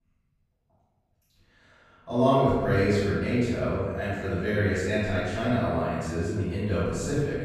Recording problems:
room echo; strong; dies away in 1.6 s
off-mic speech; far

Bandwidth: 14 kHz